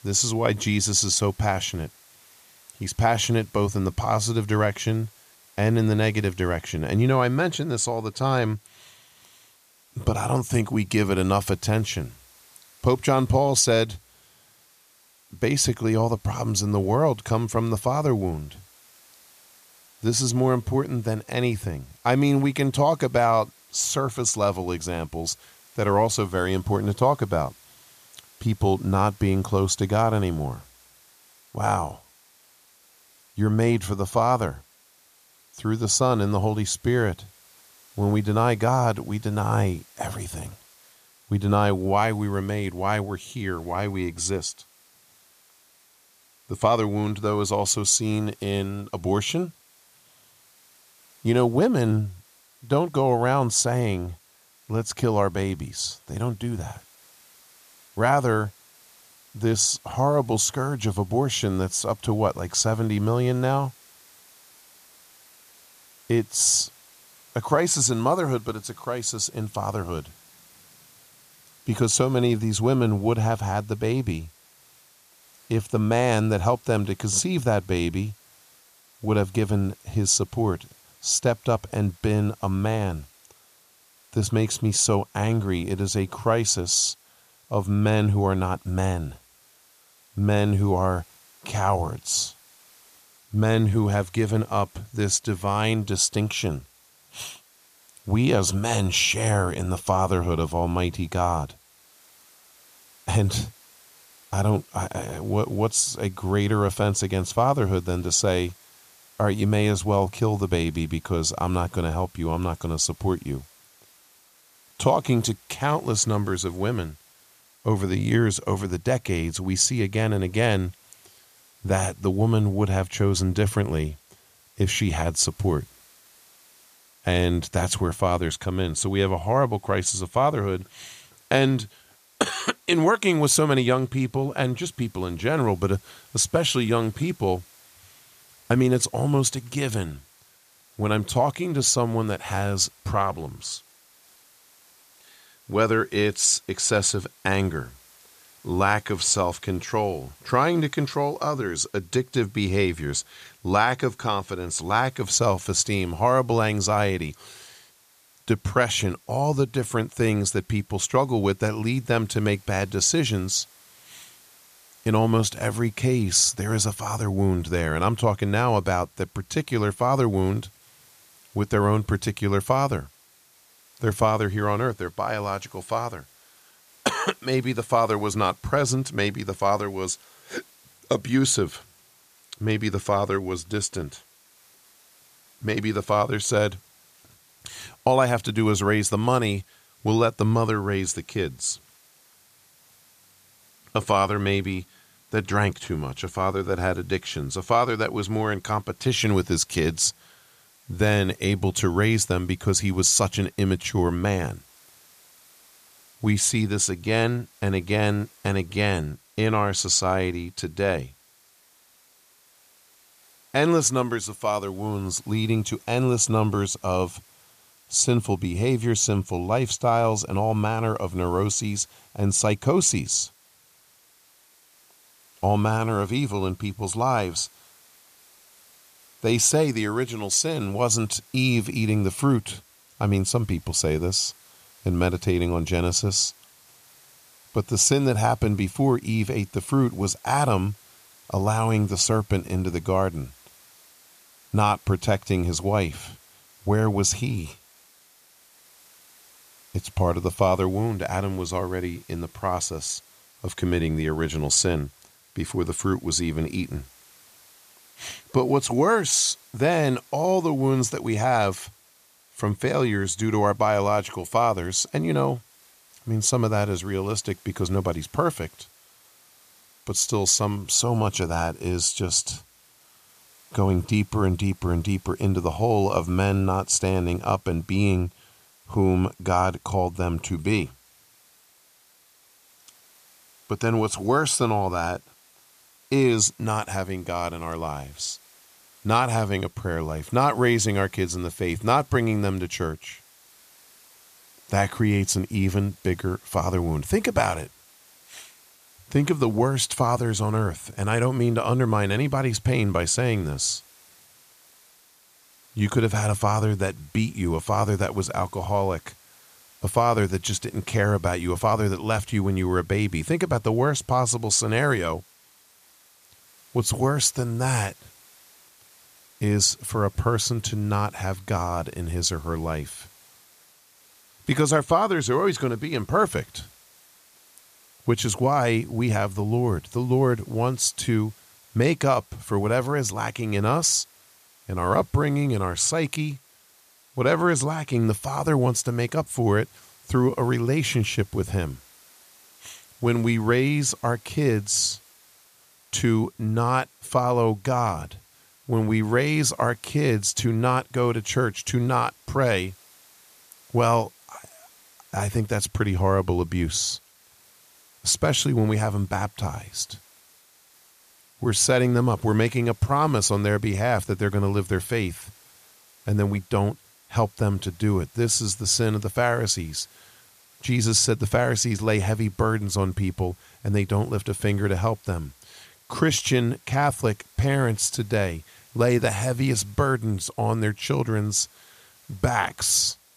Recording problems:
hiss; faint; throughout; 30 dB below the speech

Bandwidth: 14.5 kHz